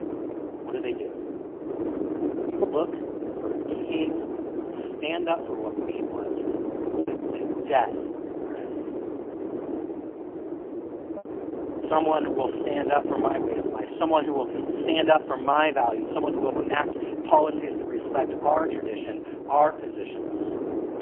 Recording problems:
phone-call audio; poor line; nothing above 3 kHz
distortion; slight; 20 dB below the speech
wind noise on the microphone; heavy; 9 dB below the speech
choppy; occasionally; 1% of the speech affected

